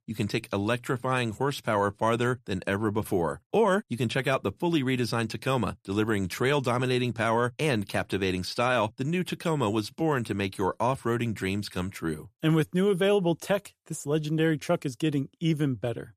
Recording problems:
none

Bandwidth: 14.5 kHz